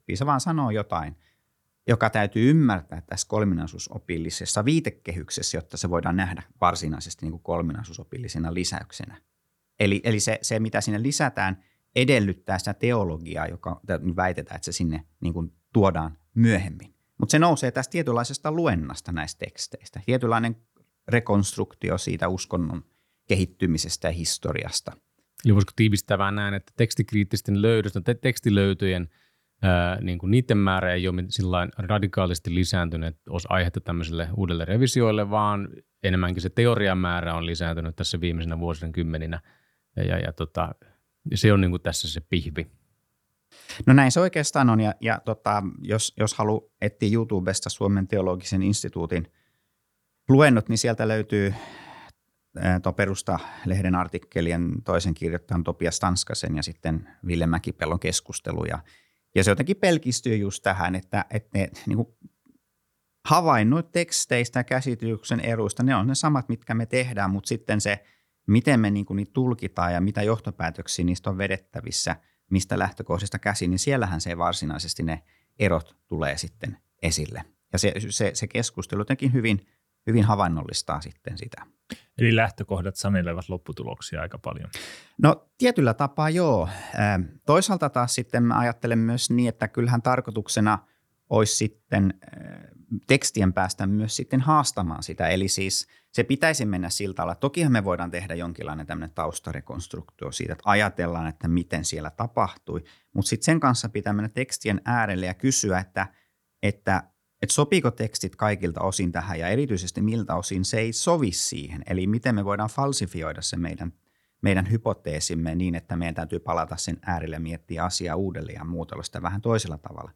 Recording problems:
none

